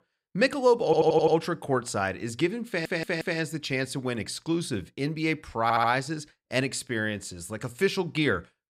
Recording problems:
audio stuttering; at 1 s, at 2.5 s and at 5.5 s

